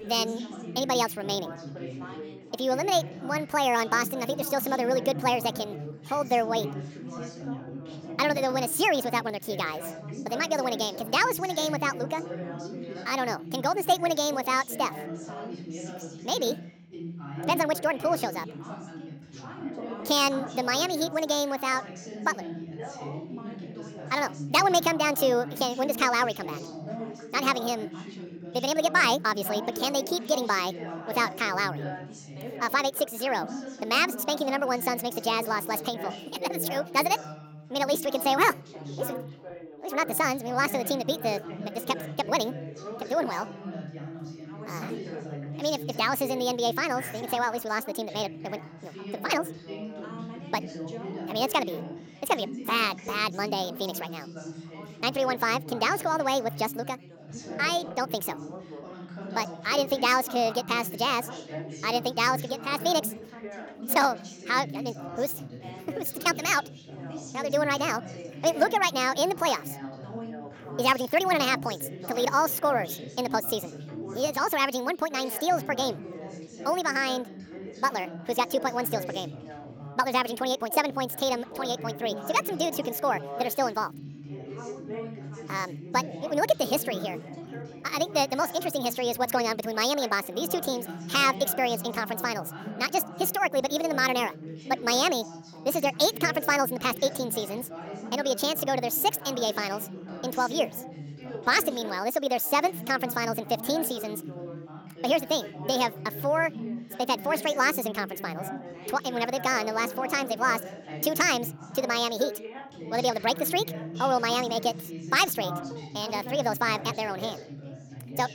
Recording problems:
wrong speed and pitch; too fast and too high; 1.6 times normal speed
background chatter; noticeable; throughout; 3 voices, 10 dB below the speech

